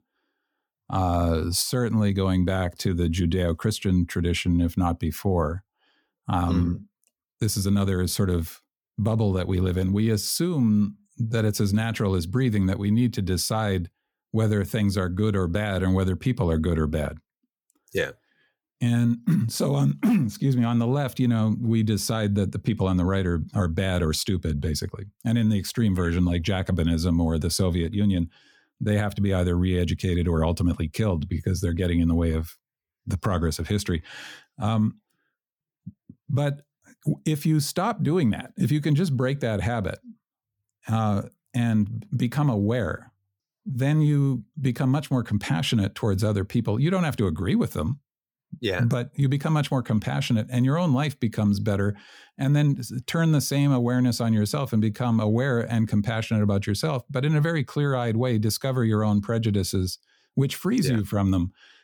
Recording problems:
none

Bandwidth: 18.5 kHz